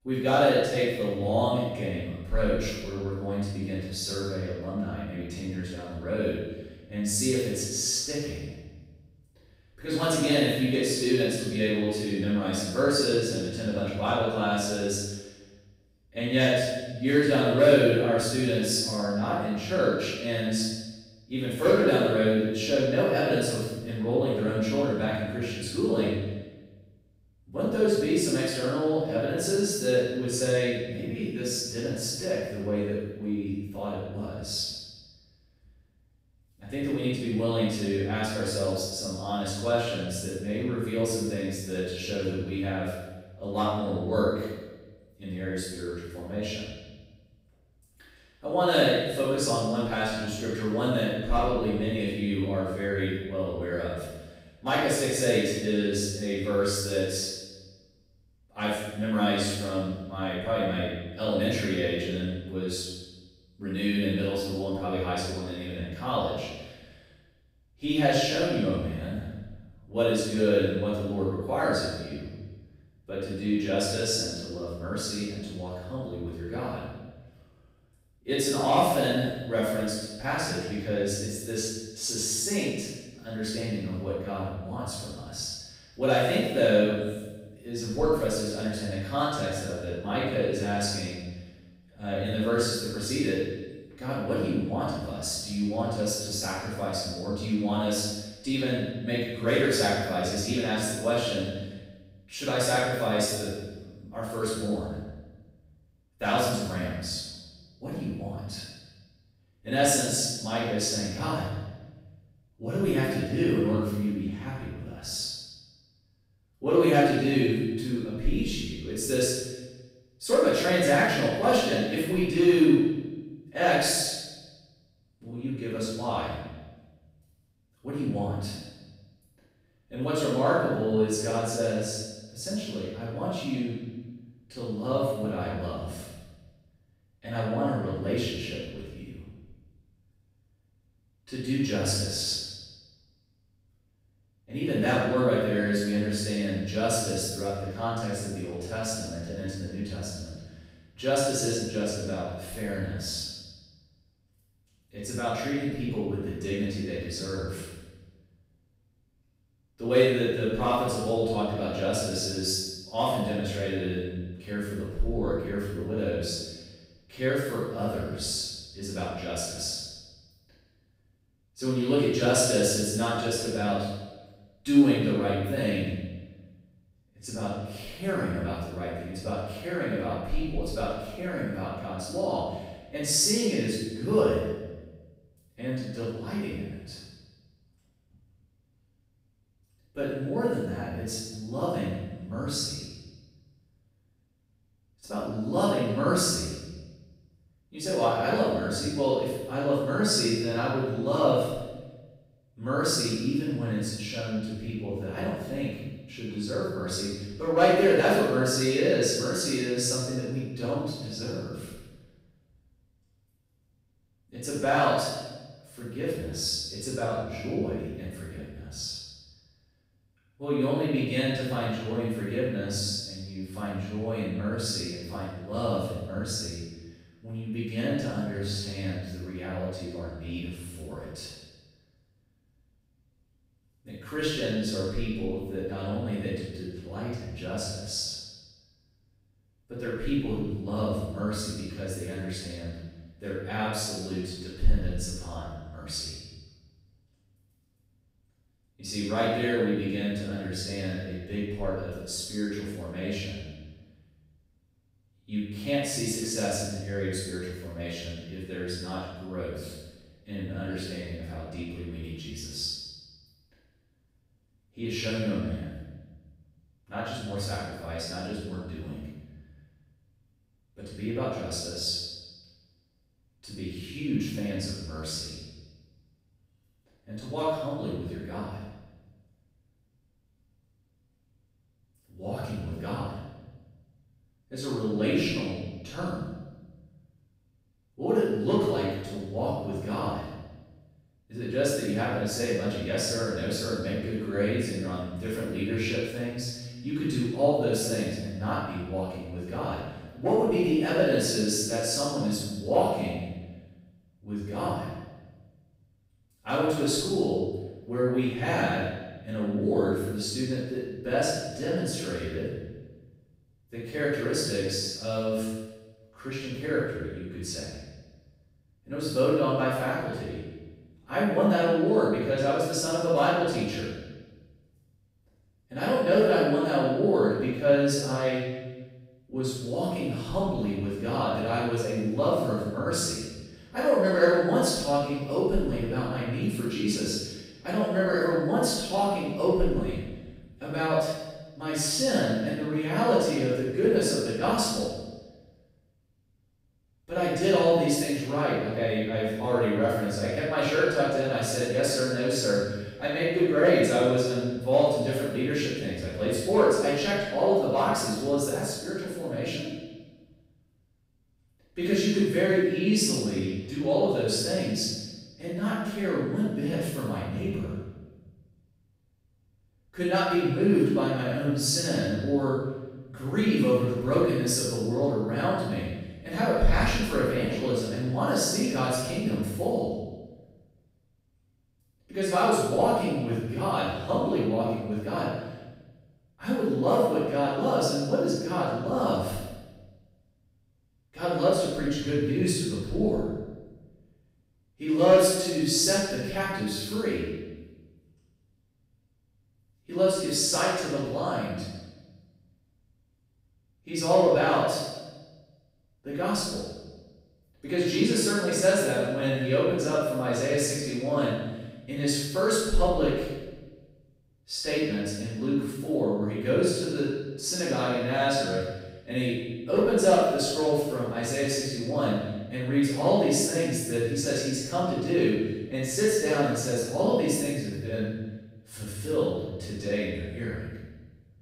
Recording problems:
room echo; strong; dies away in 1.1 s
off-mic speech; far

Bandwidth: 15.5 kHz